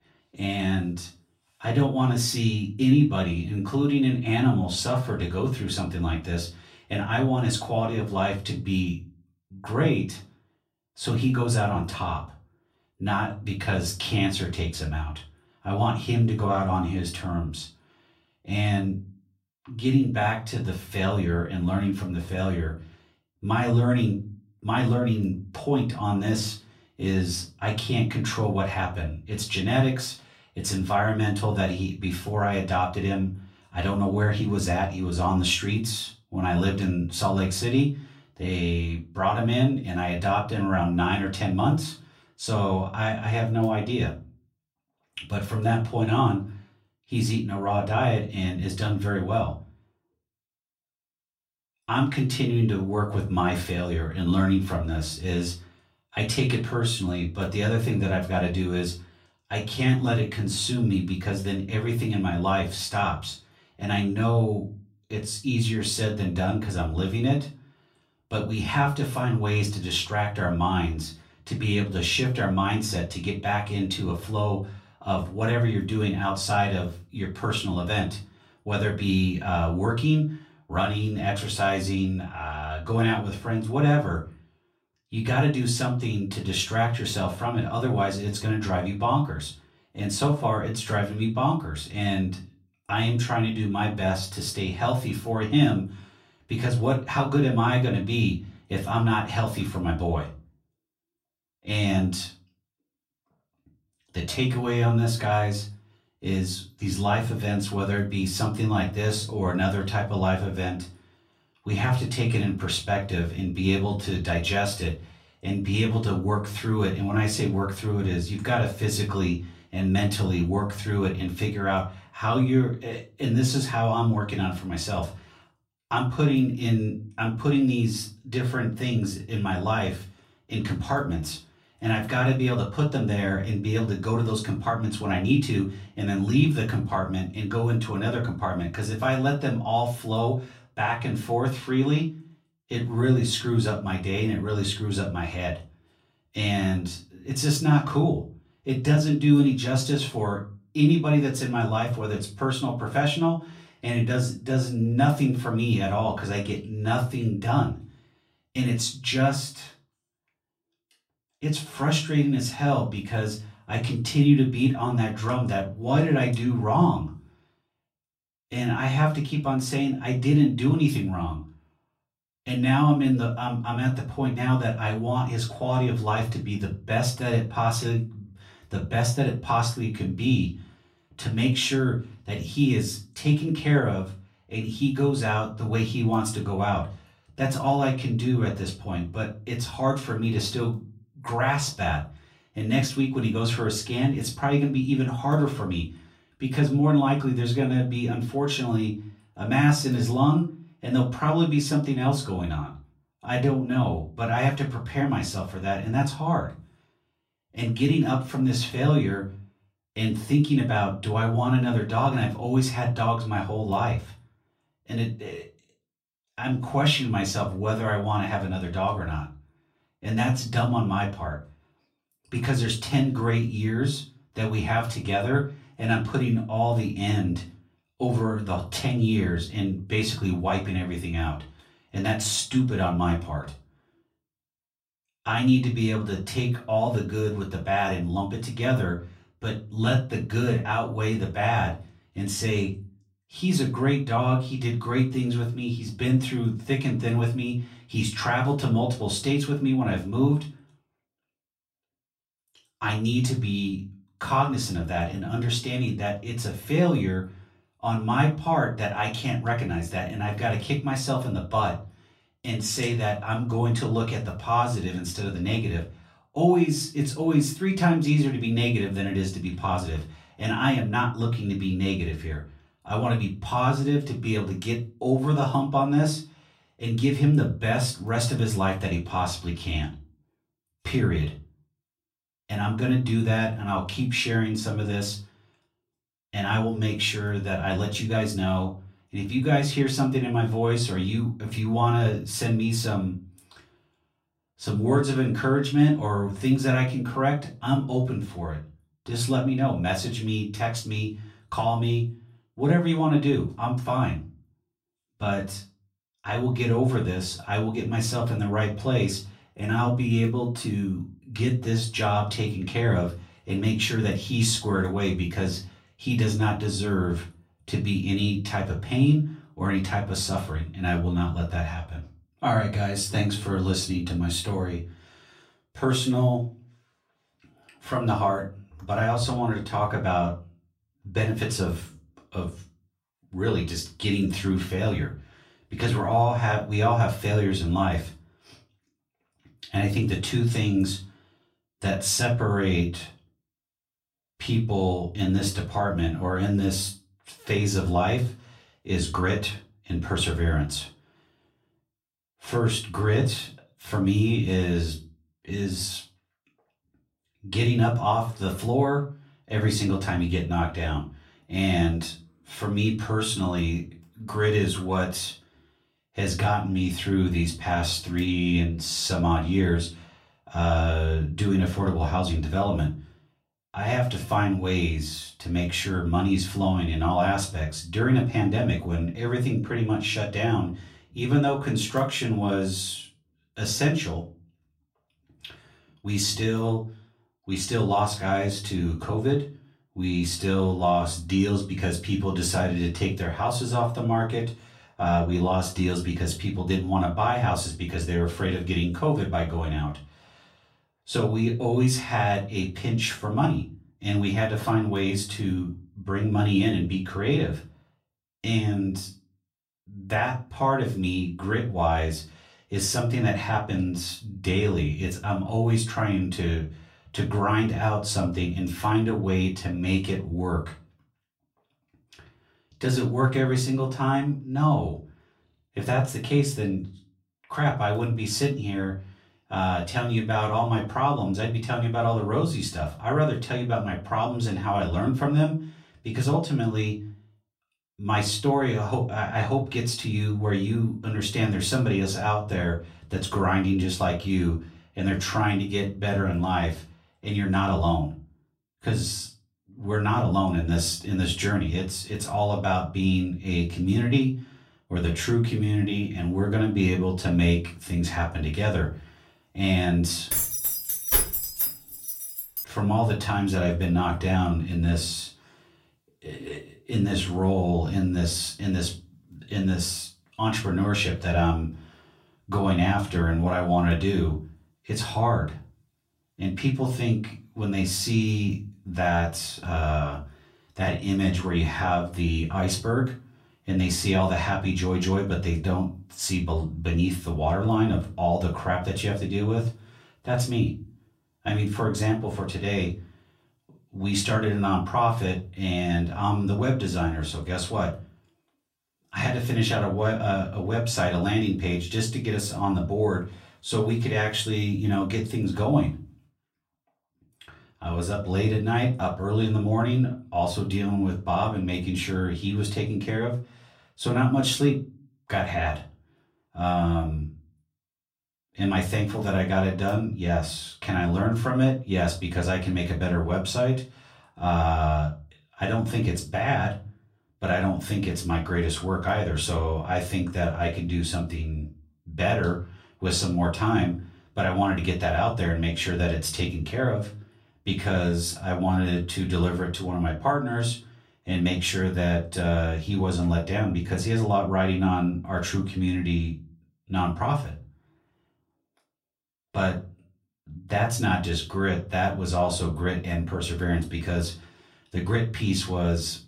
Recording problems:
off-mic speech; far
room echo; very slight; dies away in 0.3 s
jangling keys; loud; from 7:40 to 7:43; peak 5 dB above the speech

